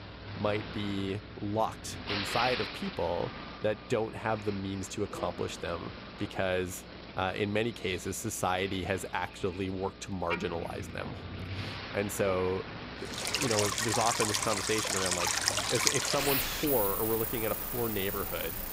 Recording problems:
rain or running water; very loud; from 13 s on; 3 dB above the speech
traffic noise; loud; throughout; 8 dB below the speech
electrical hum; faint; throughout; 60 Hz, 25 dB below the speech

